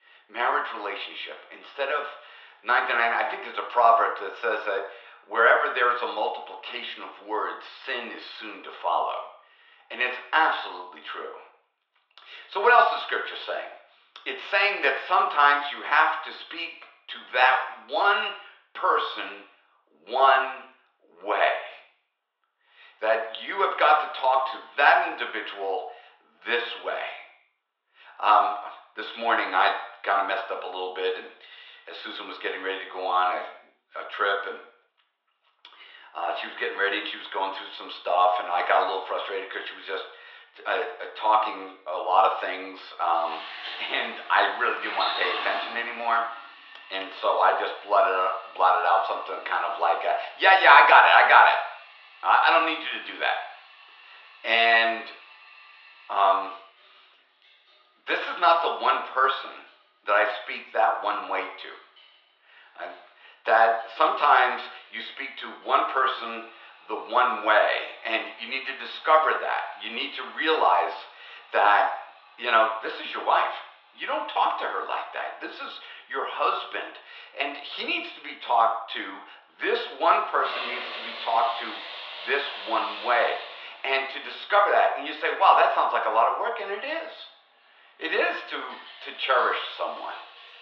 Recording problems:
thin; very; fading below 600 Hz
muffled; slightly; fading above 4 kHz
room echo; slight; dies away in 0.6 s
off-mic speech; somewhat distant
household noises; noticeable; from 43 s on; 15 dB below the speech

